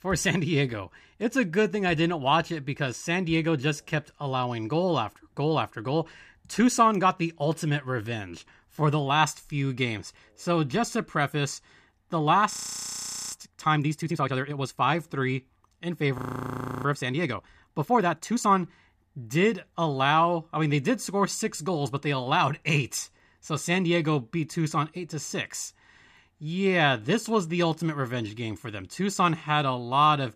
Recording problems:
audio freezing; at 13 s for 1 s and at 16 s for 0.5 s

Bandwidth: 14.5 kHz